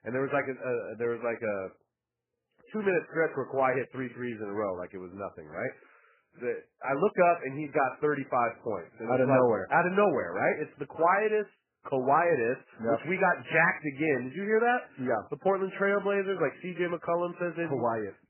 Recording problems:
garbled, watery; badly; nothing above 2.5 kHz

